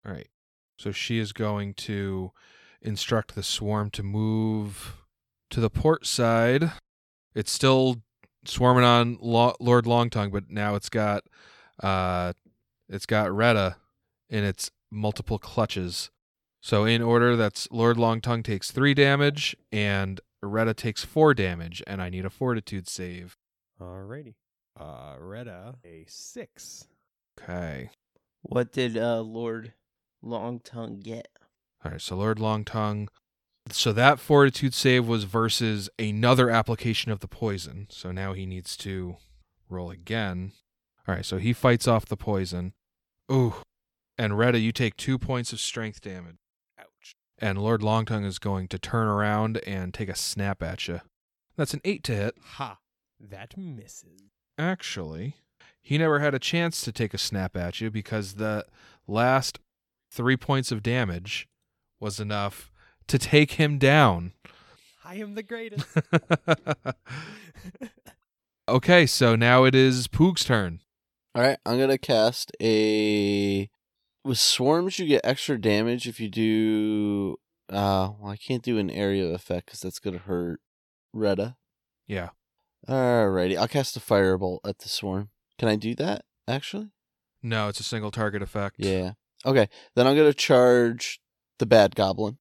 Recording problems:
none

